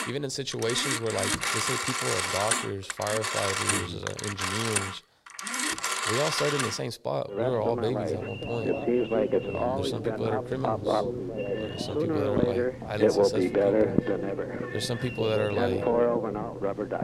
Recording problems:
alarms or sirens; very loud; throughout; 4 dB above the speech

